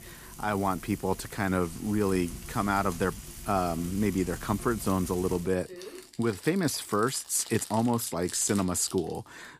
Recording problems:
household noises; noticeable; throughout; 15 dB below the speech

